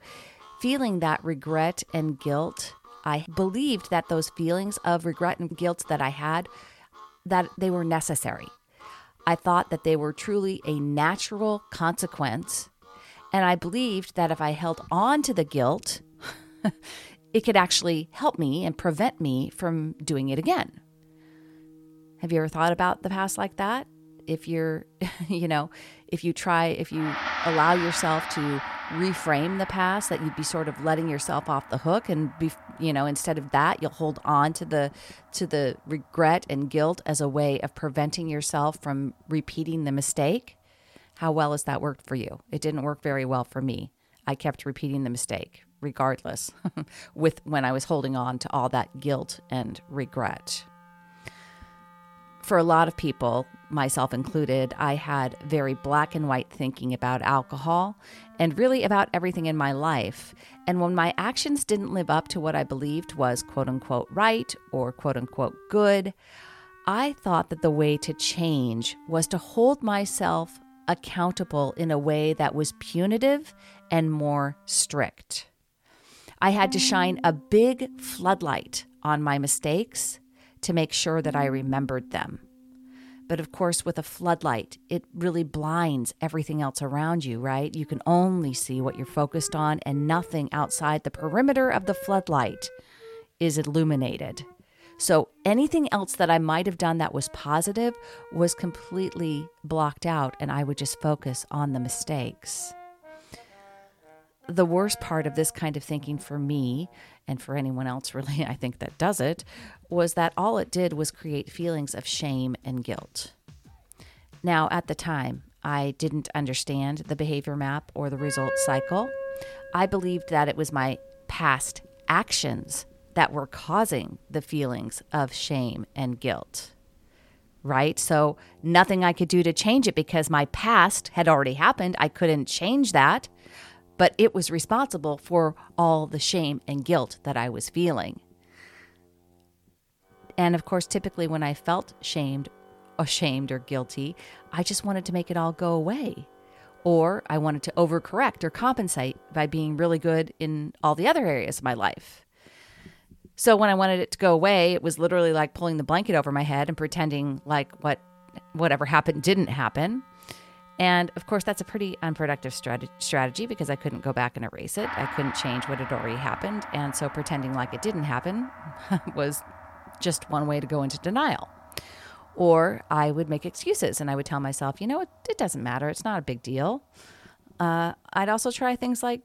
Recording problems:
background music; noticeable; throughout; 15 dB below the speech

